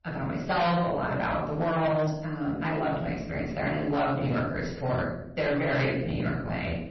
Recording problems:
off-mic speech; far
room echo; noticeable; dies away in 0.6 s
distortion; slight; 9% of the sound clipped
garbled, watery; slightly; nothing above 6 kHz

